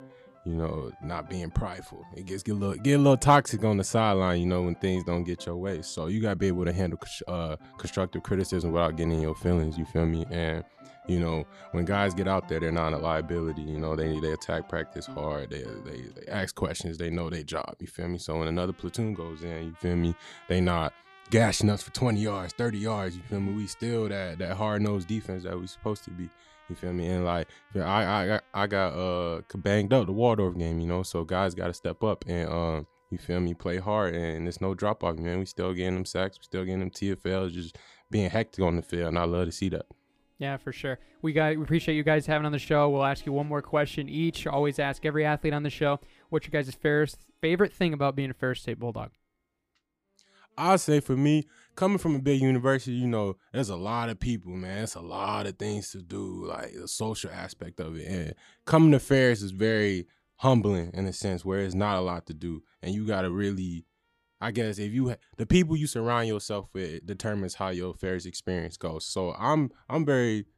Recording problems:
background music; faint; throughout; 25 dB below the speech

